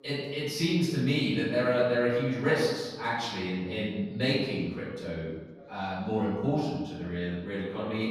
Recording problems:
room echo; strong; dies away in 1.3 s
off-mic speech; far
voice in the background; faint; throughout; 30 dB below the speech

